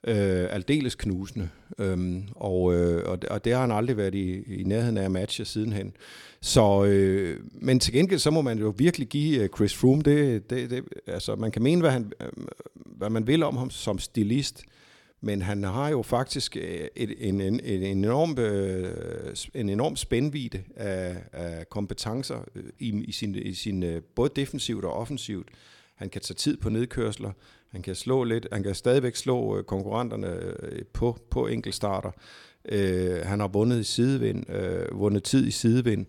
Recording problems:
none

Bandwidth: 17.5 kHz